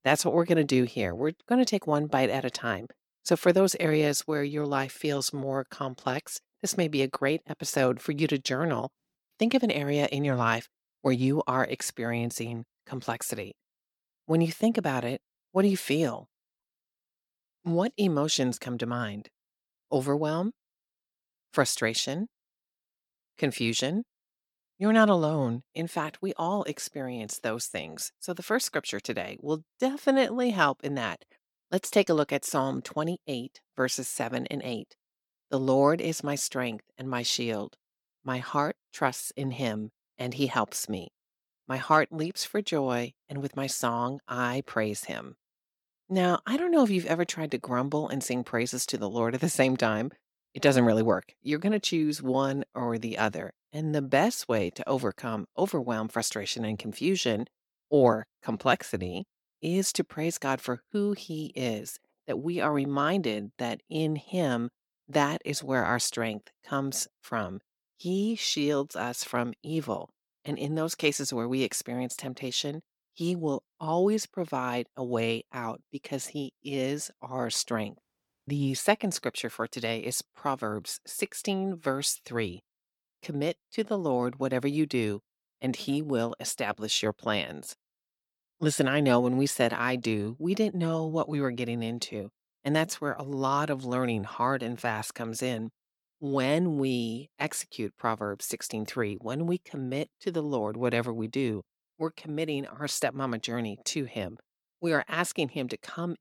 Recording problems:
none

